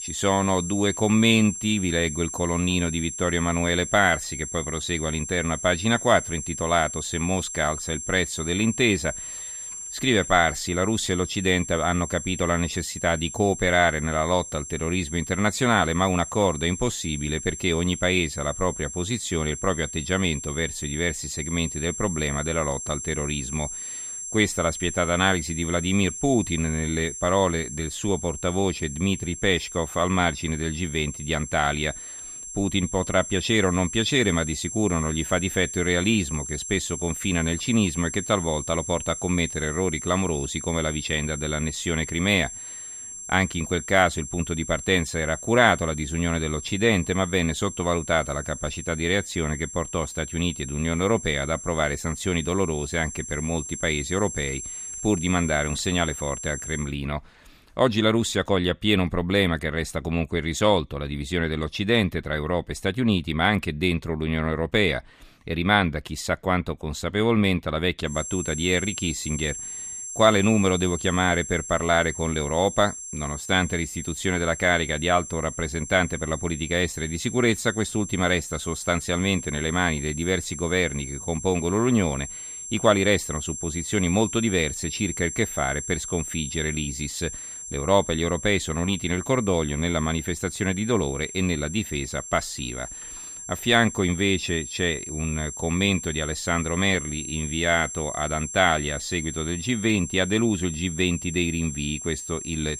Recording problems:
high-pitched whine; loud; until 57 s and from 1:08 on; 7.5 kHz, 9 dB below the speech

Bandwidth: 14.5 kHz